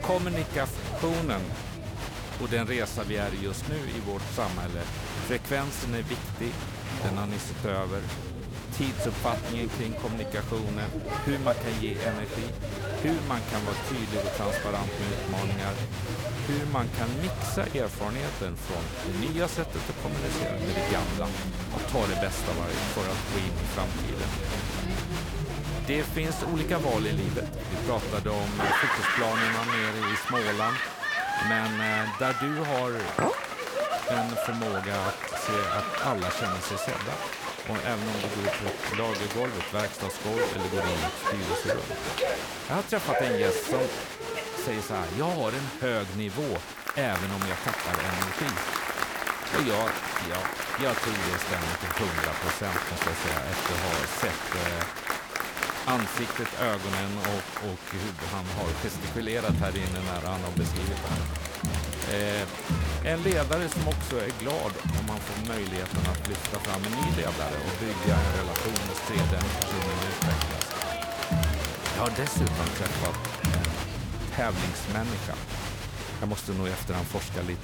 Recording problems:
crowd noise; very loud; throughout; 1 dB above the speech
clattering dishes; loud; at 33 s; peak 4 dB above the speech

